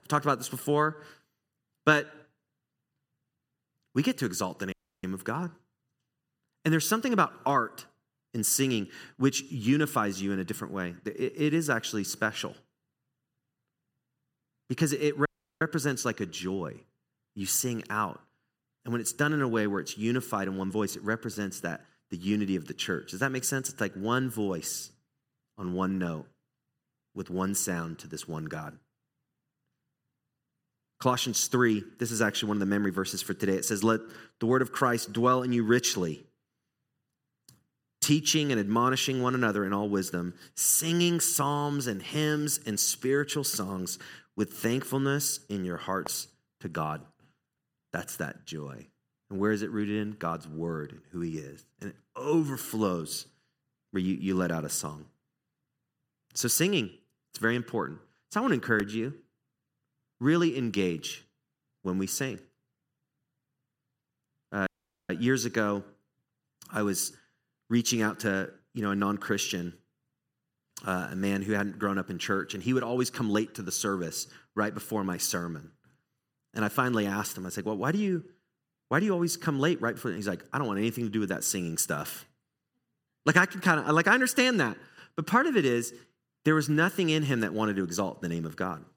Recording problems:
audio cutting out; at 4.5 s, at 15 s and at 1:05

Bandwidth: 16.5 kHz